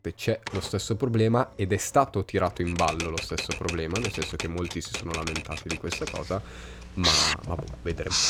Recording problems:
household noises; loud; throughout; 1 dB below the speech

